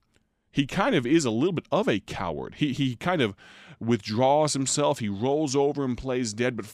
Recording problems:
none

